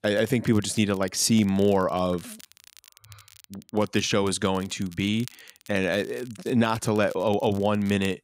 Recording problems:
crackle, like an old record; faint; 25 dB below the speech

